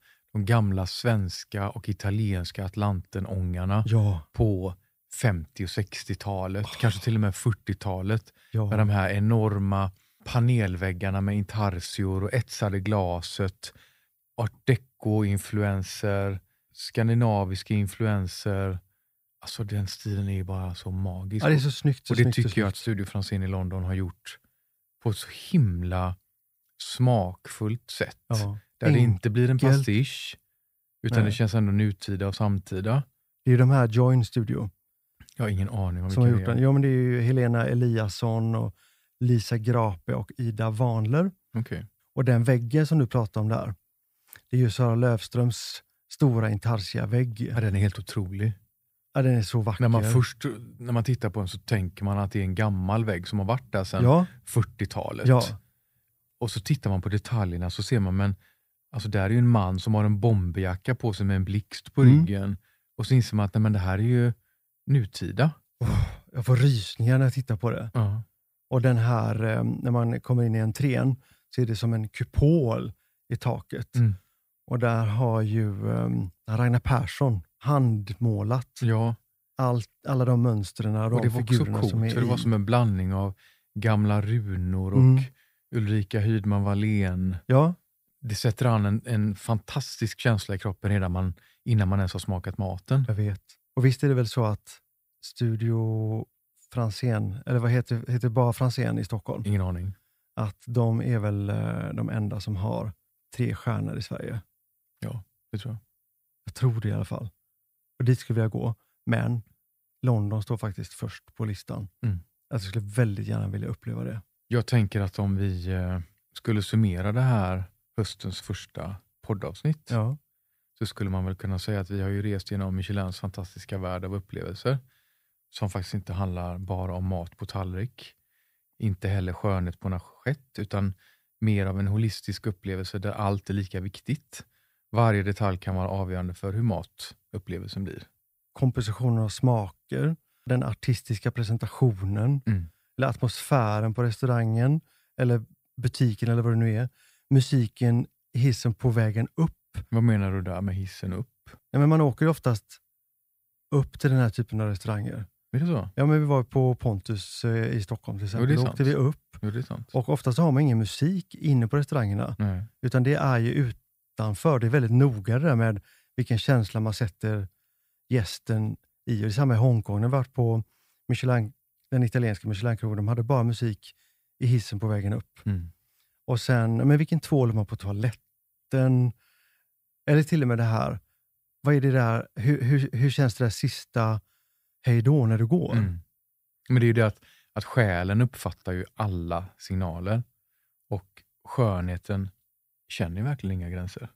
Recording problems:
none

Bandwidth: 15.5 kHz